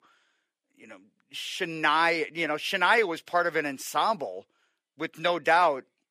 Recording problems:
thin; somewhat; fading below 450 Hz

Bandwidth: 15 kHz